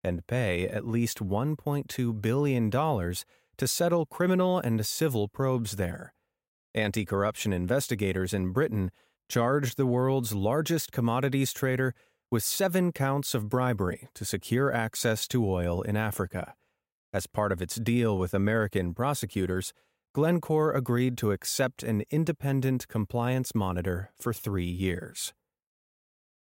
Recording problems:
none

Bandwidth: 16 kHz